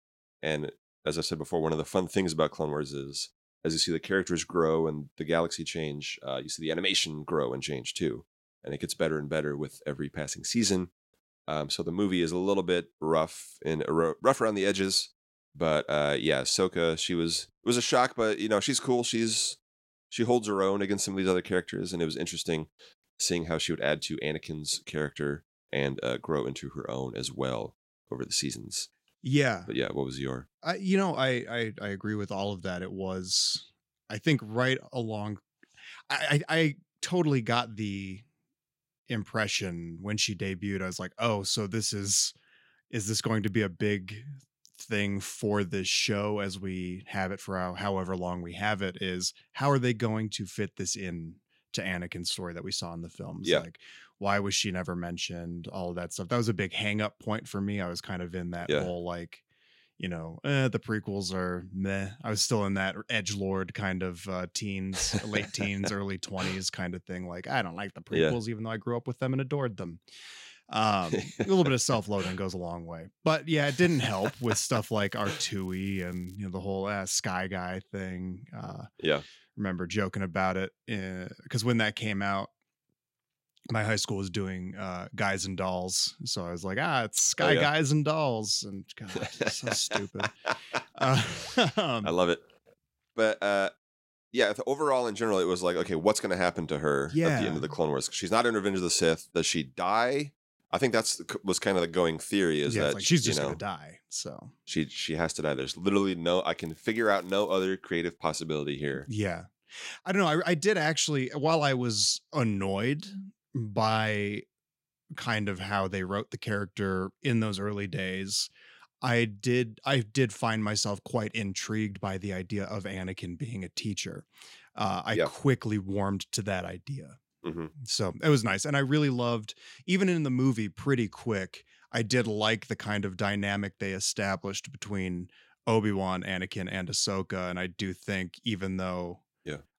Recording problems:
crackling; faint; from 1:14 to 1:16 and from 1:47 to 1:48; 25 dB below the speech

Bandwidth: 16 kHz